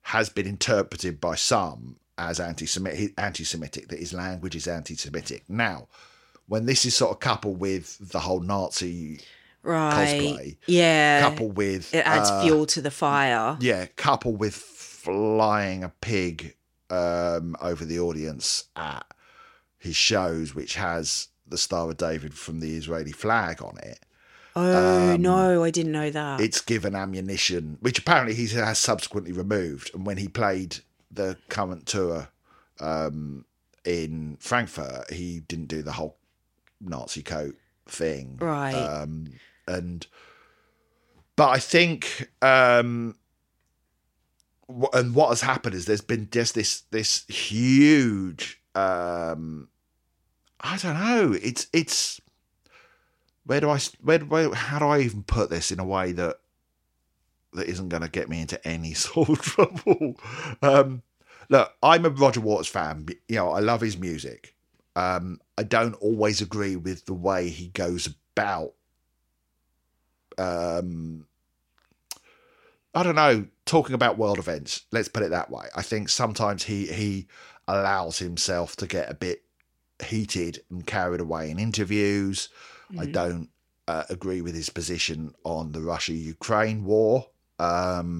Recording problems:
abrupt cut into speech; at the end

